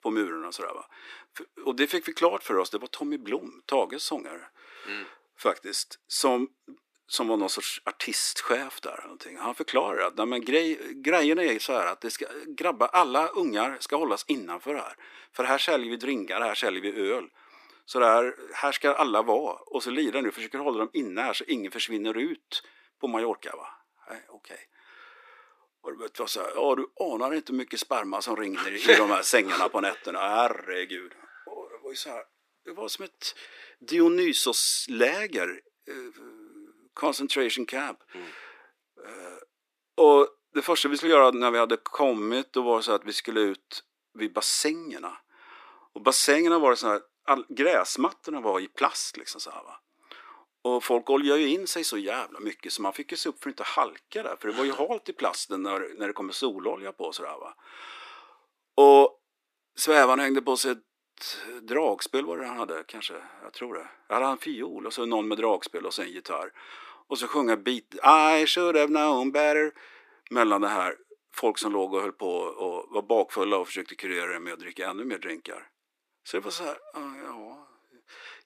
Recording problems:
thin; somewhat; fading below 300 Hz

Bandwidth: 14.5 kHz